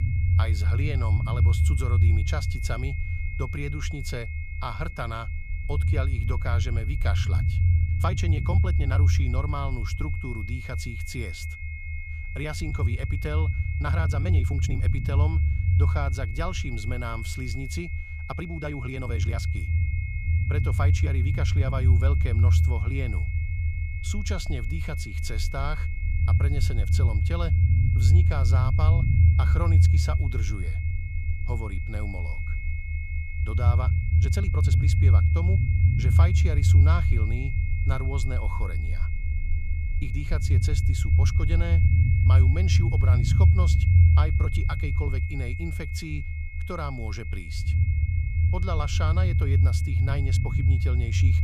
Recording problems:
high-pitched whine; loud; throughout; 2 kHz, 6 dB below the speech
low rumble; loud; throughout; 3 dB below the speech
uneven, jittery; strongly; from 8 to 45 s

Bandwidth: 14.5 kHz